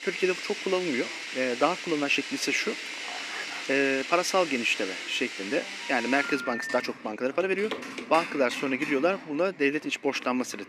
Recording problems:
thin; very slightly; fading below 300 Hz
household noises; loud; throughout; 8 dB below the speech
chatter from many people; faint; throughout; 25 dB below the speech
uneven, jittery; strongly; from 0.5 to 9 s
dog barking; faint; at 3 s; peak 10 dB below the speech
phone ringing; noticeable; from 6 to 7 s; peak 6 dB below the speech
footsteps; noticeable; at 7.5 s; peak 9 dB below the speech

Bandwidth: 14.5 kHz